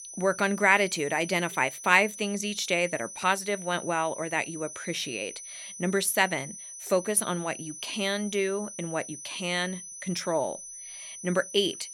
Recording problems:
high-pitched whine; noticeable; throughout; 6 kHz, 10 dB below the speech

